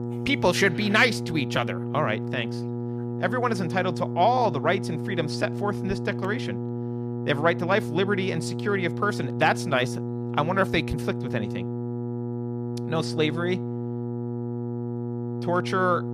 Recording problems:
electrical hum; noticeable; throughout; 60 Hz, 10 dB below the speech

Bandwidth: 15 kHz